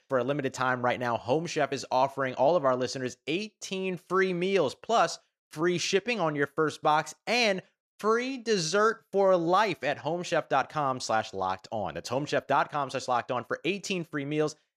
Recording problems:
none

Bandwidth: 14.5 kHz